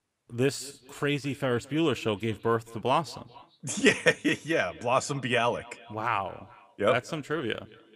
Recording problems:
echo of what is said; faint; throughout; 220 ms later, 20 dB below the speech

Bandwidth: 15 kHz